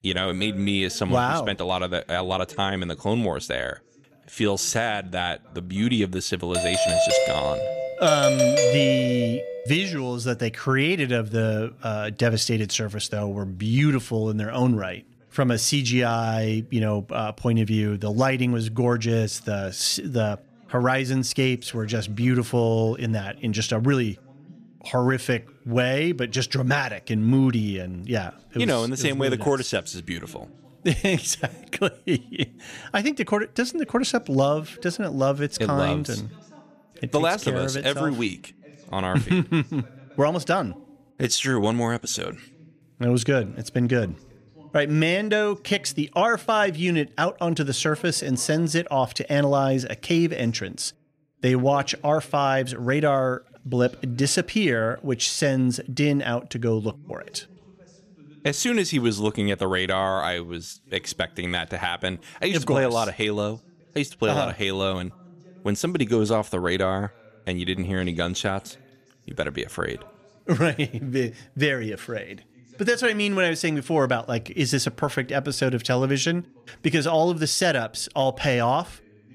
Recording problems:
voice in the background; faint; throughout; 25 dB below the speech
doorbell; loud; from 6.5 to 9.5 s; peak 5 dB above the speech

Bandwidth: 14.5 kHz